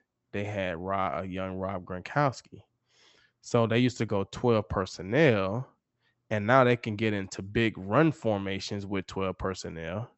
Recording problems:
high frequencies cut off; noticeable; nothing above 8 kHz

